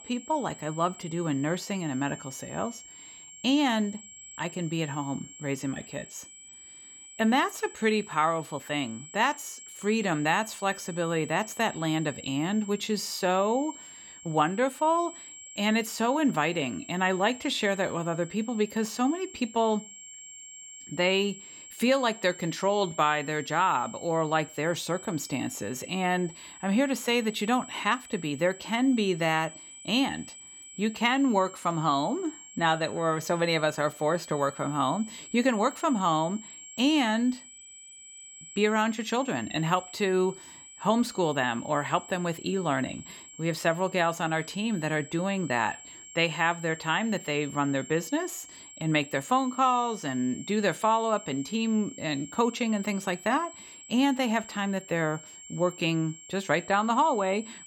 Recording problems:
high-pitched whine; noticeable; throughout; 7.5 kHz, 15 dB below the speech

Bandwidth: 17.5 kHz